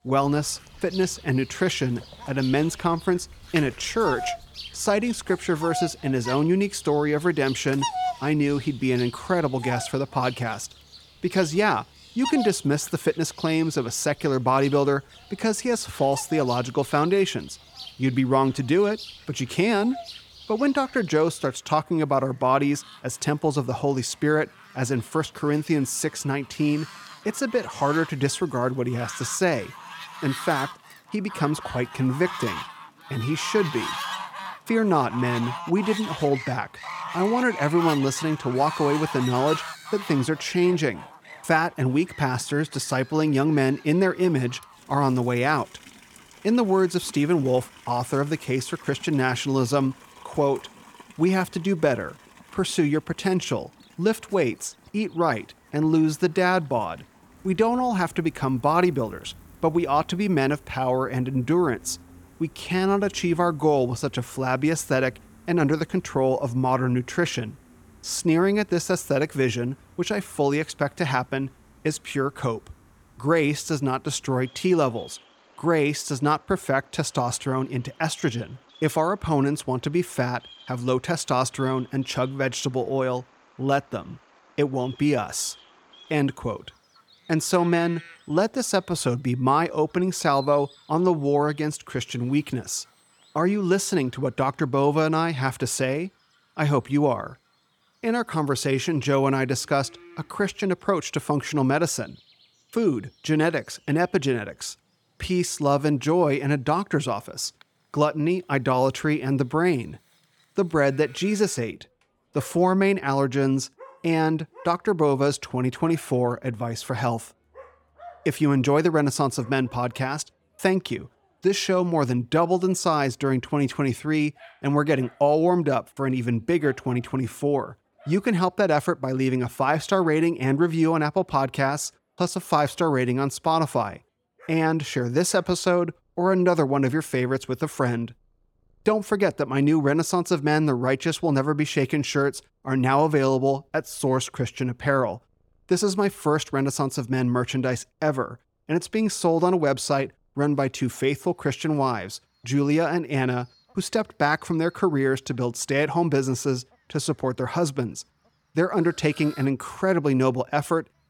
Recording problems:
animal sounds; noticeable; throughout; 15 dB below the speech

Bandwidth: 18.5 kHz